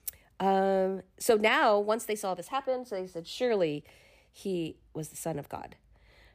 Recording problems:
none

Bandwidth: 15 kHz